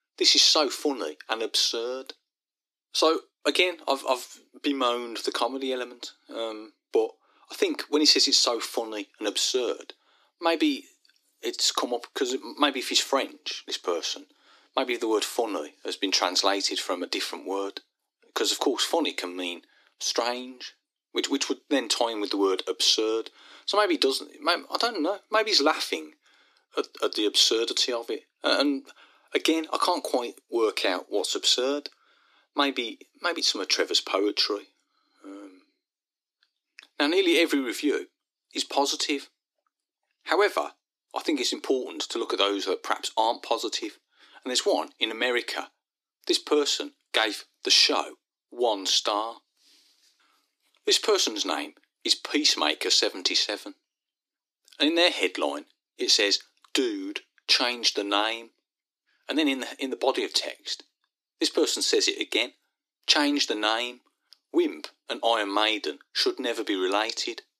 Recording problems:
thin; somewhat; fading below 300 Hz

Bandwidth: 14.5 kHz